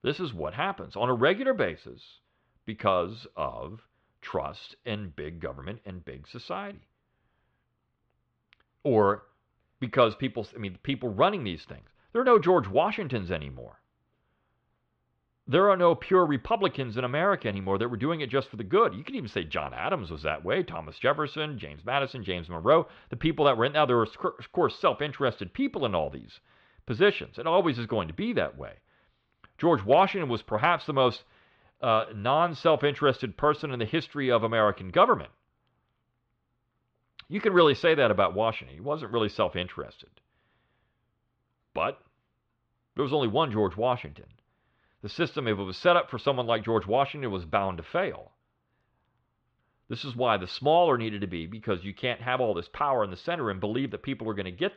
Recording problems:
muffled; slightly; fading above 3.5 kHz

